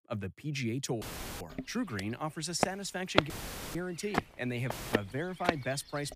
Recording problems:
audio cutting out; filled with static; at 1 s, at 3.5 s and at 4.5 s
footsteps; loud; from 1.5 to 5.5 s; peak 6 dB above the speech

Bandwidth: 15 kHz